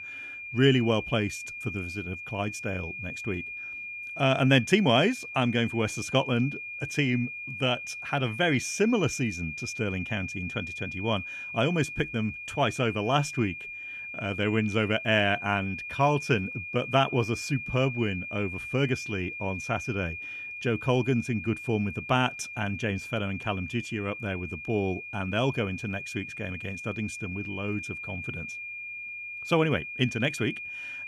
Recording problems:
high-pitched whine; loud; throughout; 2.5 kHz, 8 dB below the speech

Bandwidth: 14.5 kHz